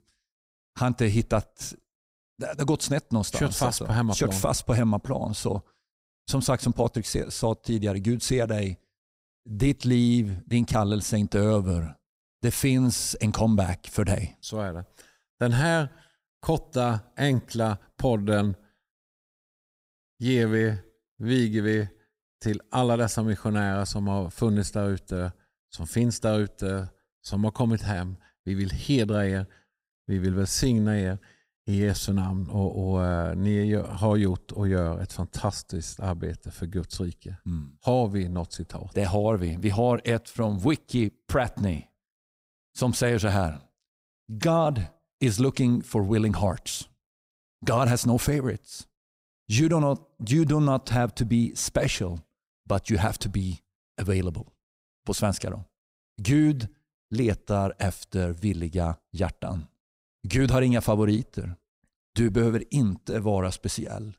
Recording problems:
none

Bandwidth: 15.5 kHz